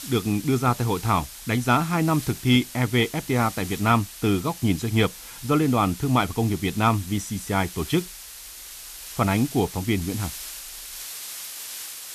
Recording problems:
hiss; noticeable; throughout; 15 dB below the speech

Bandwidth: 14 kHz